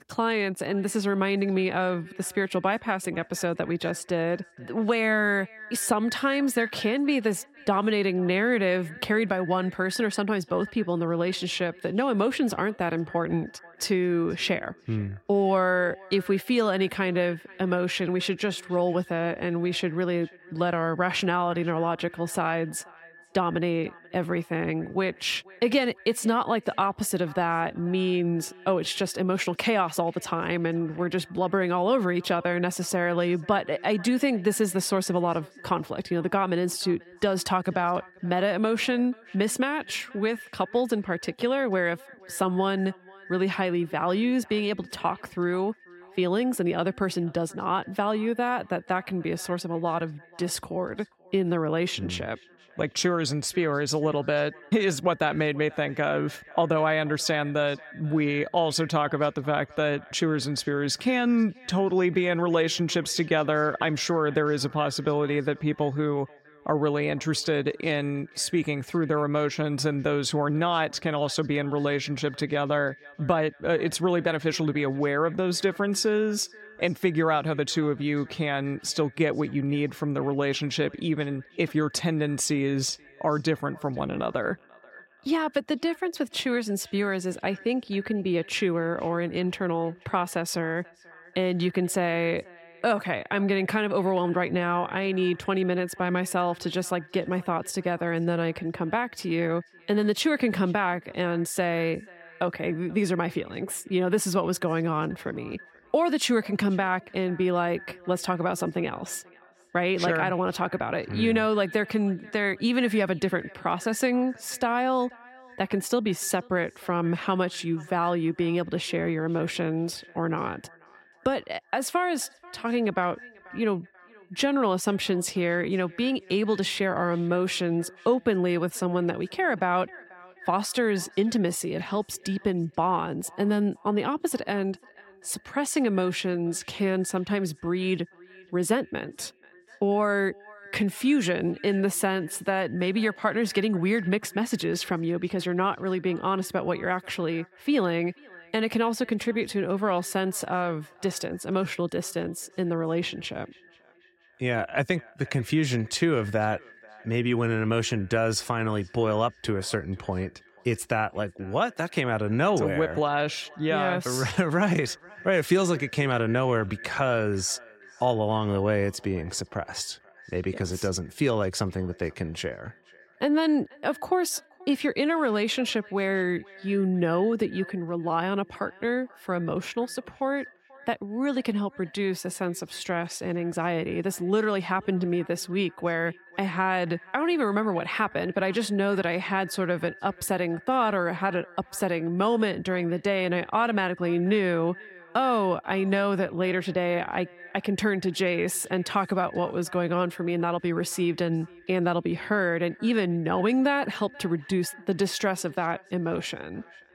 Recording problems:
echo of what is said; faint; throughout; 490 ms later, 20 dB below the speech

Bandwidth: 16 kHz